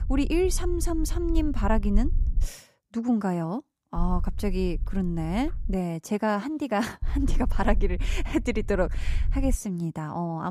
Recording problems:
low rumble; faint; until 2.5 s, from 4 to 5.5 s and from 7 to 9.5 s; 20 dB below the speech
abrupt cut into speech; at the end

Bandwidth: 15 kHz